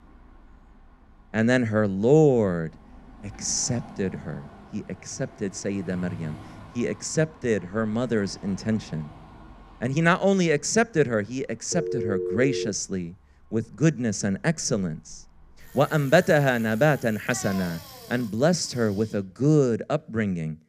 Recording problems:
traffic noise; faint; throughout; 20 dB below the speech
phone ringing; noticeable; at 12 s; peak 4 dB below the speech

